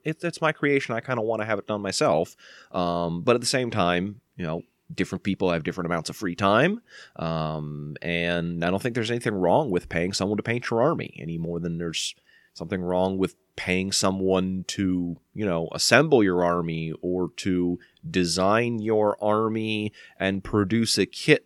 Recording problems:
none

